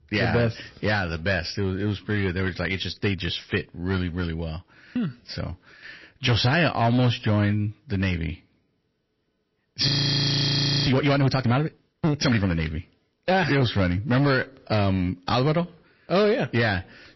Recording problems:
distortion; slight; 7% of the sound clipped
garbled, watery; slightly; nothing above 5.5 kHz
audio freezing; at 10 s for 1 s

